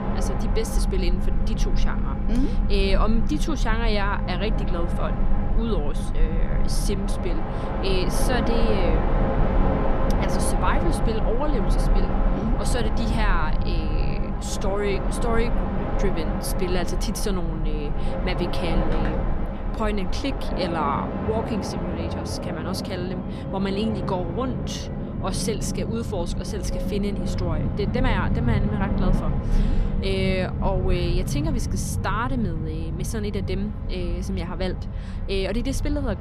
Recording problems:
train or aircraft noise; very loud; throughout; 3 dB above the speech

